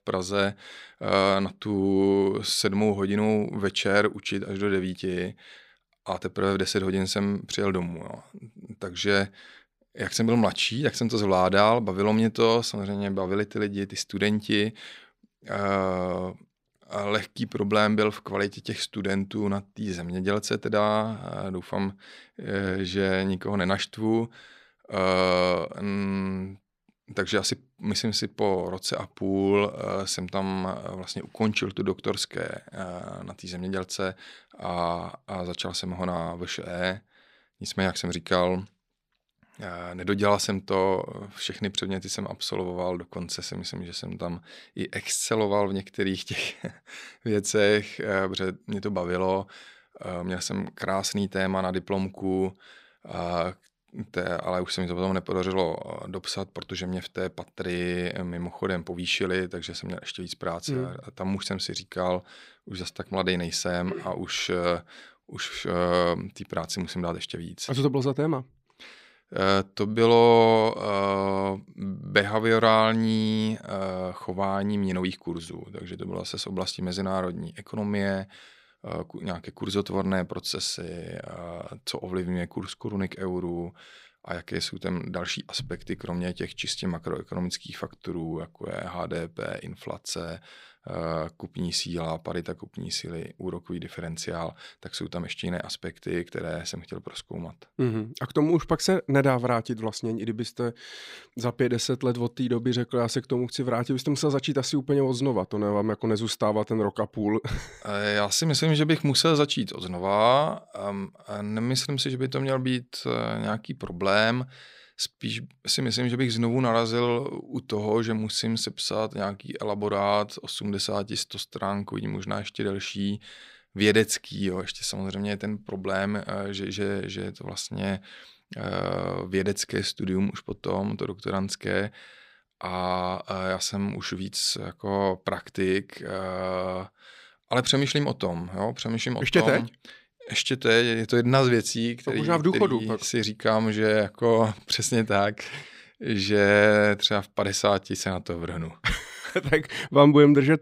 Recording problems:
none

